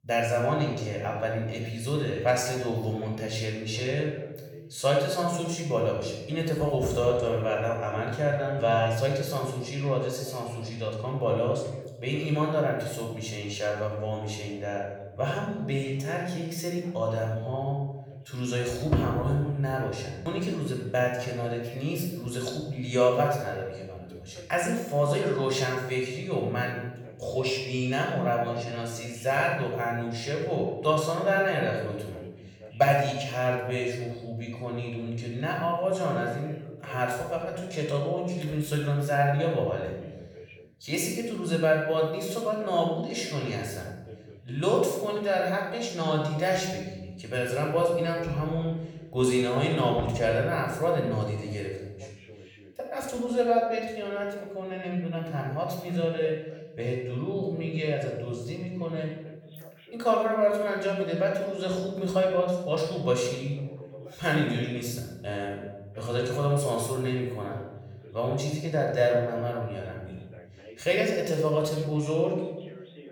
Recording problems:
off-mic speech; far
room echo; noticeable; dies away in 1 s
voice in the background; faint; throughout; 20 dB below the speech

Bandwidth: 18.5 kHz